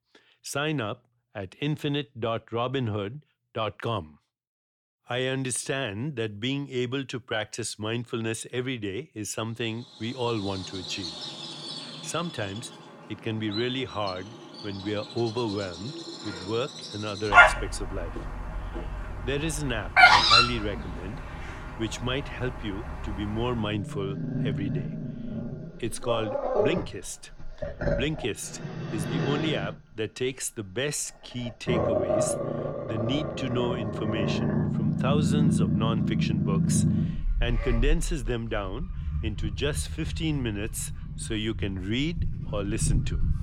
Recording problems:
animal sounds; very loud; from 10 s on; 5 dB above the speech

